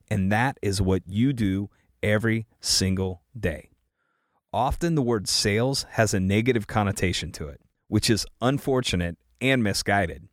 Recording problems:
none

